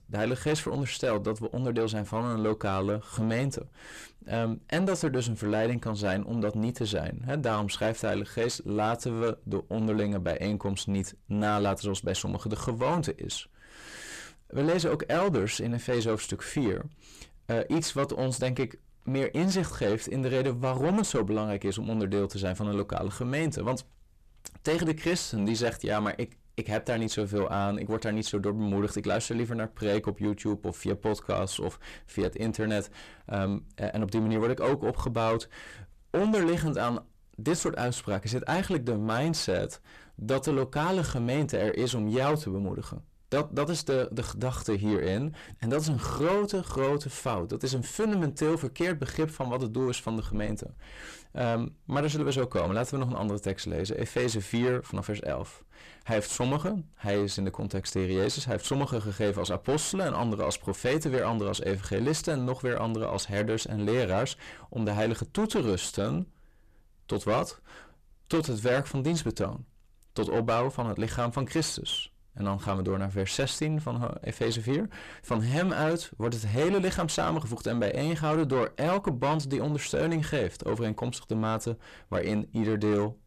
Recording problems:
distortion; heavy; 7 dB below the speech

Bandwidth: 14.5 kHz